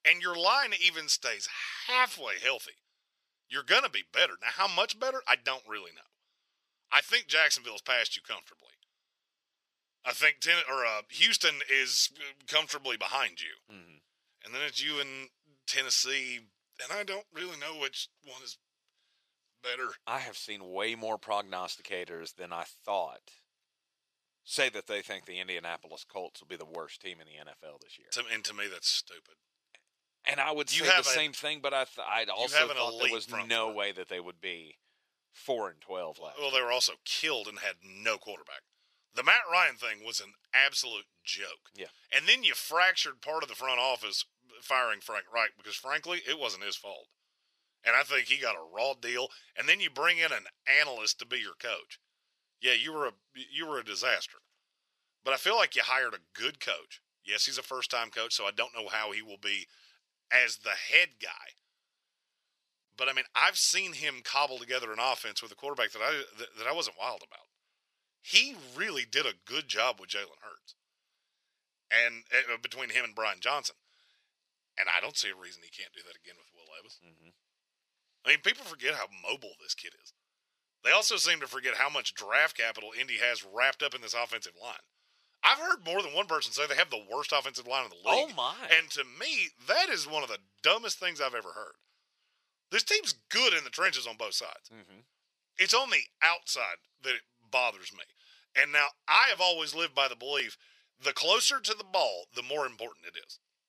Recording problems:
thin; very; fading below 600 Hz

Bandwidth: 14.5 kHz